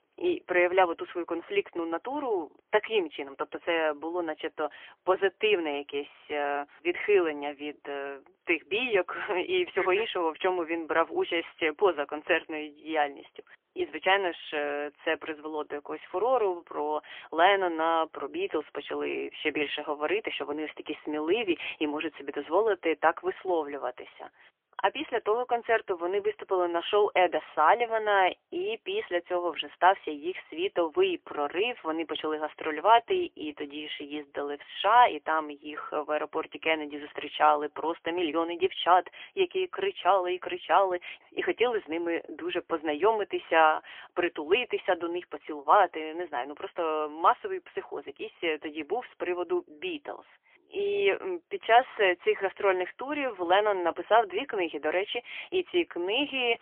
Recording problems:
phone-call audio; poor line; nothing above 3.5 kHz

